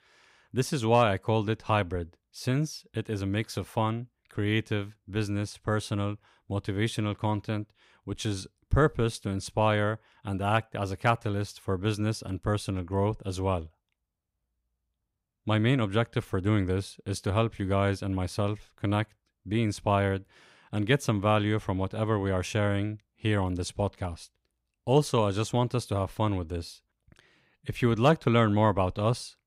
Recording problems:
none

